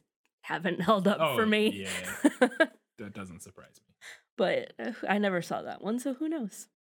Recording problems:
none

